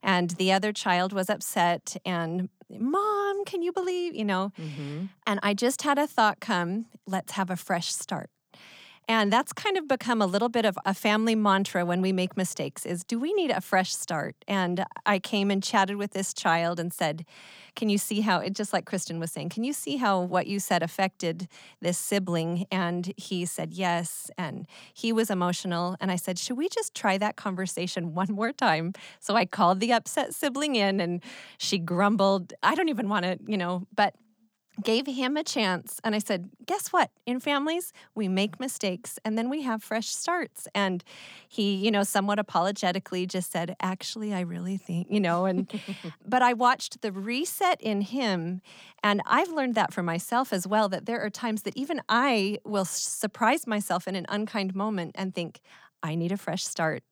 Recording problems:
none

